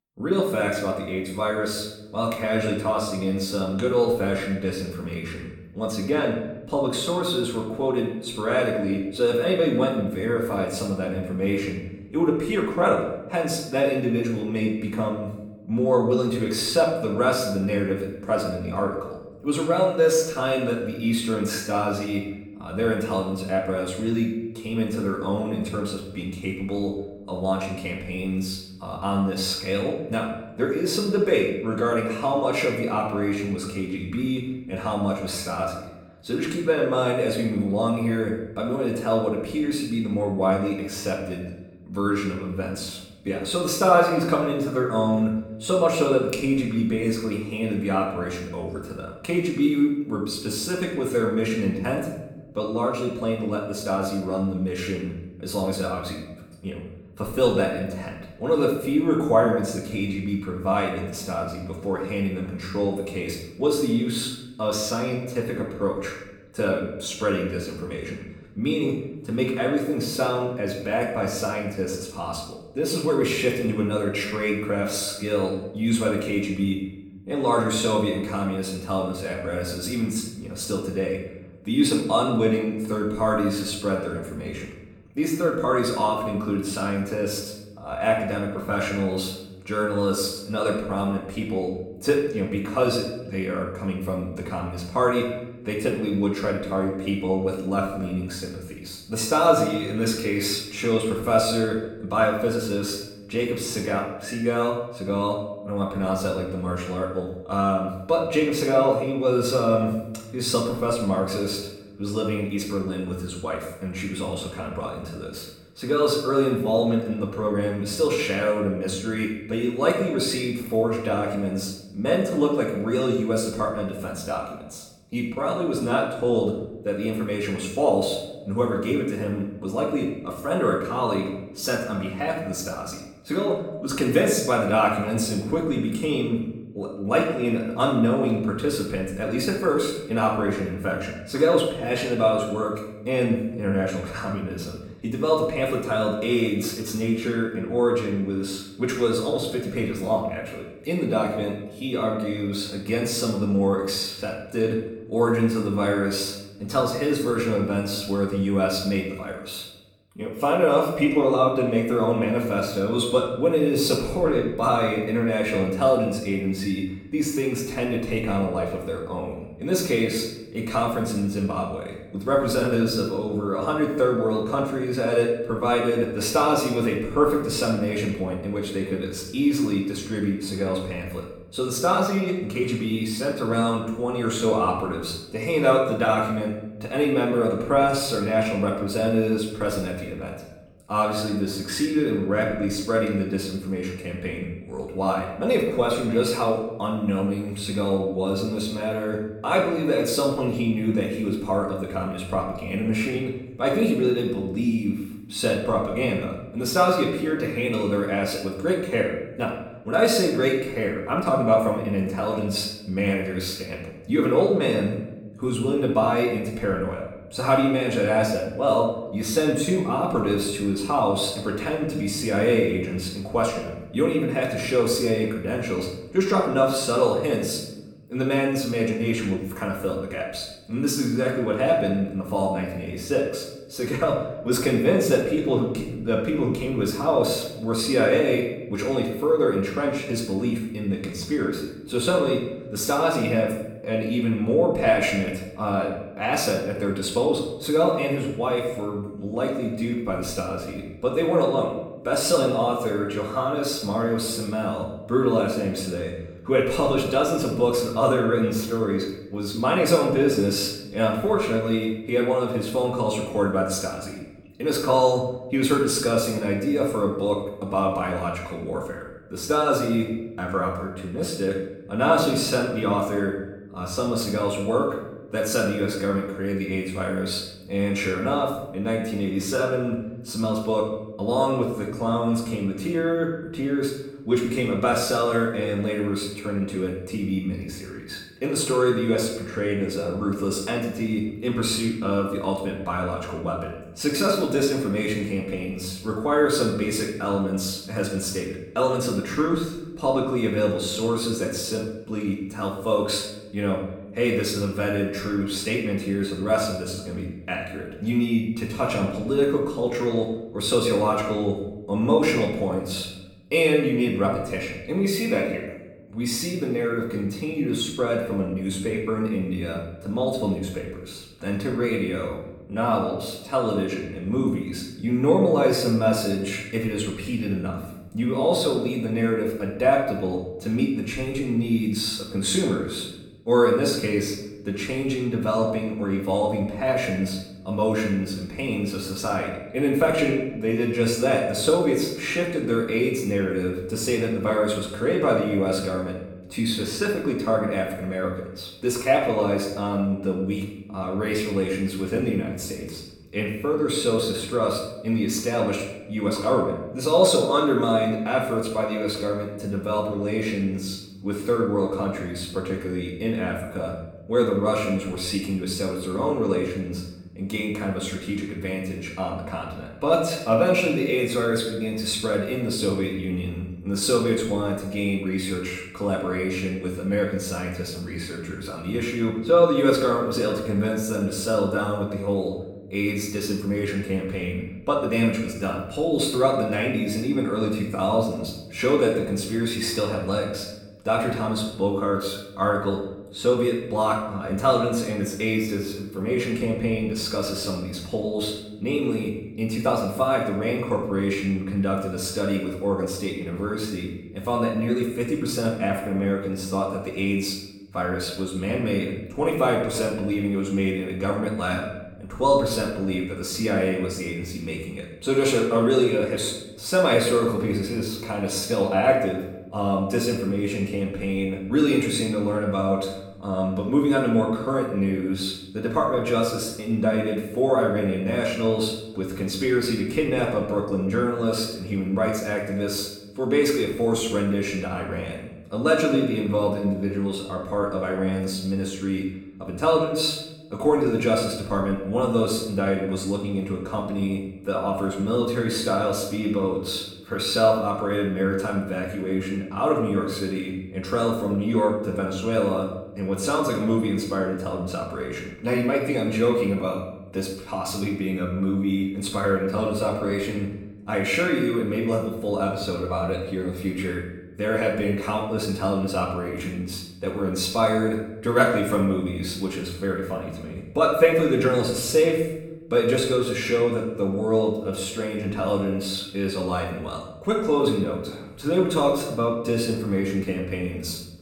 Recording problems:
off-mic speech; far
room echo; noticeable; dies away in 0.8 s

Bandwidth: 18 kHz